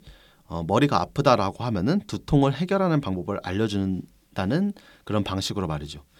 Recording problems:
none

